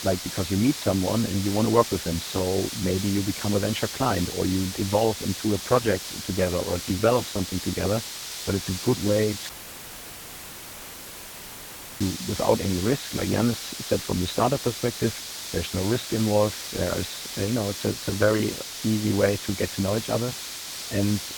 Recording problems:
garbled, watery; badly; nothing above 4 kHz
hiss; loud; throughout; 7 dB below the speech
audio cutting out; filled with static; at 9.5 s for 2.5 s

